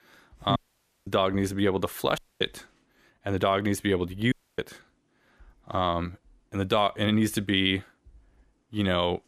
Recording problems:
audio cutting out; at 0.5 s for 0.5 s, at 2 s and at 4.5 s

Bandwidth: 14.5 kHz